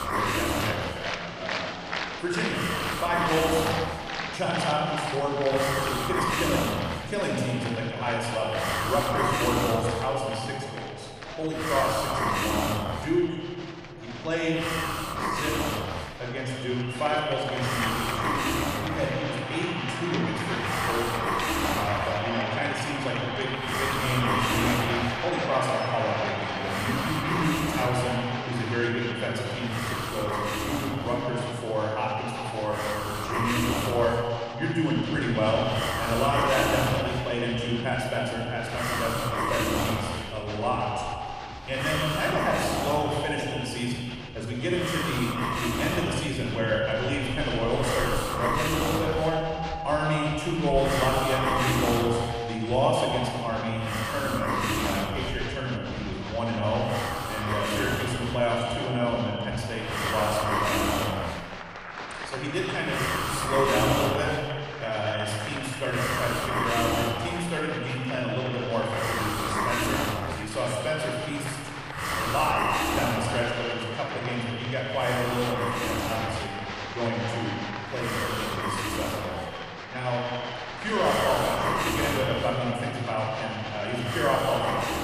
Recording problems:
echo of what is said; strong; throughout; 120 ms later, 7 dB below the speech
room echo; noticeable; dies away in 1.4 s
off-mic speech; somewhat distant
crowd noise; loud; throughout; 7 dB below the speech
hiss; loud; throughout; as loud as the speech

